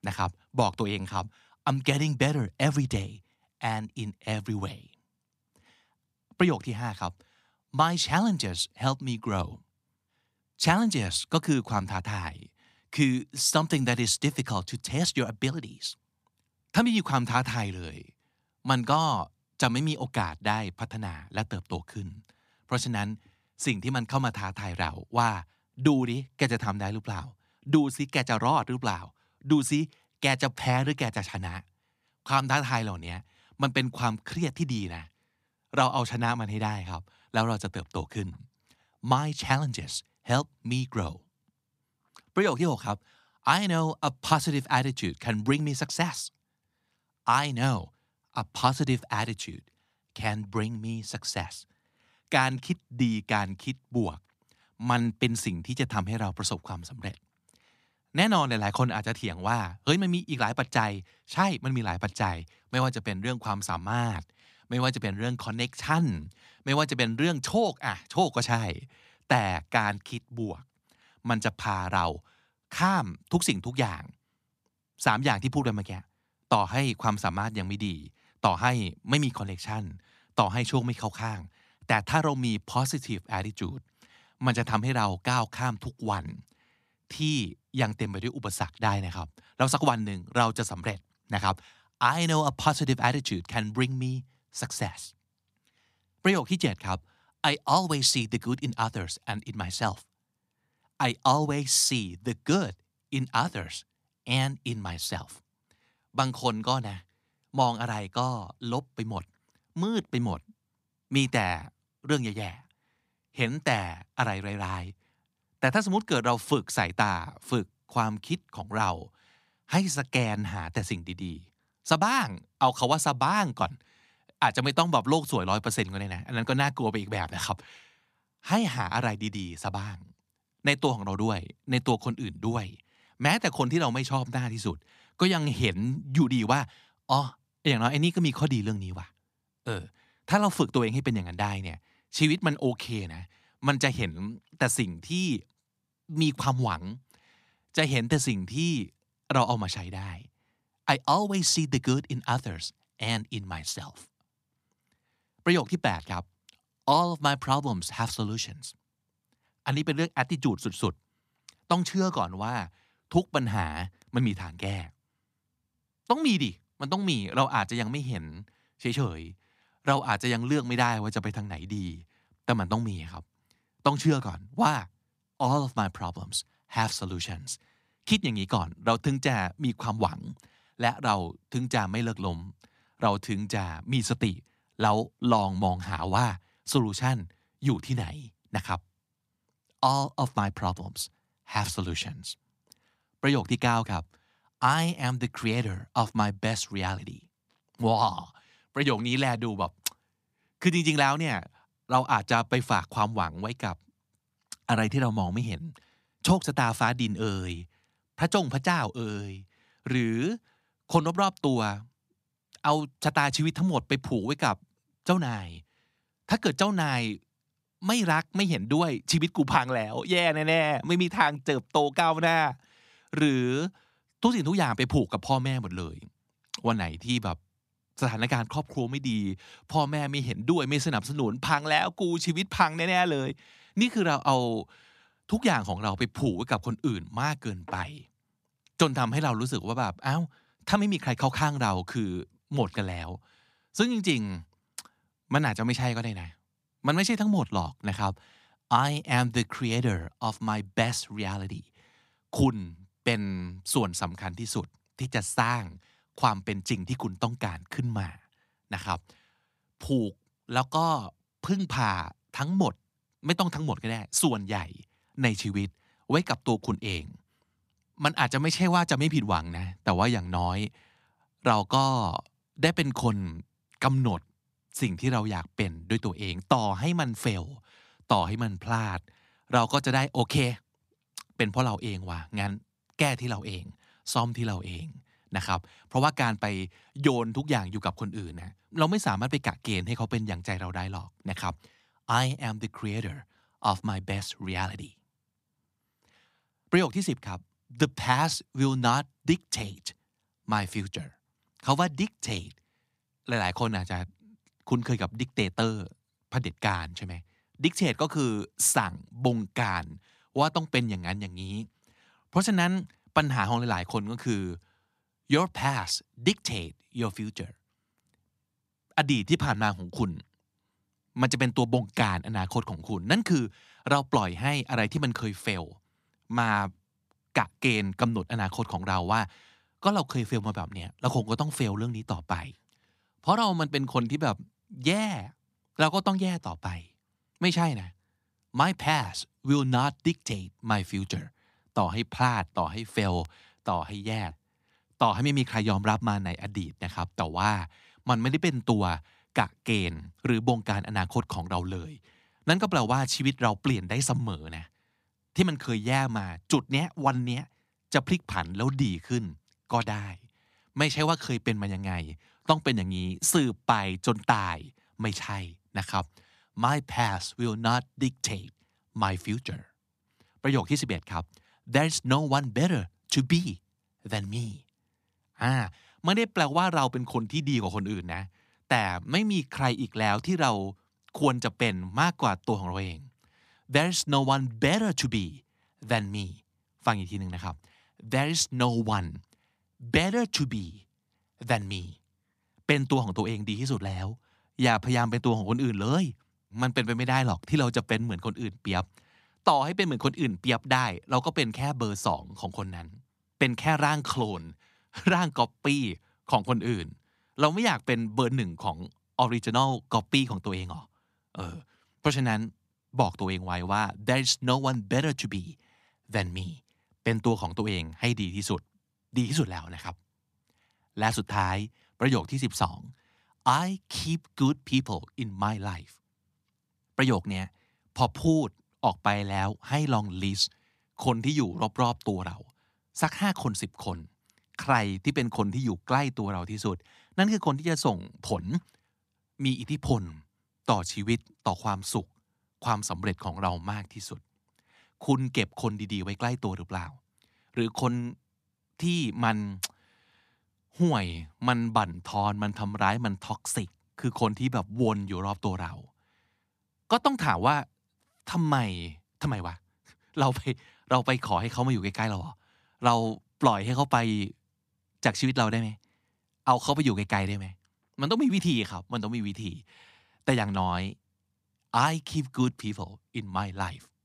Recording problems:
none

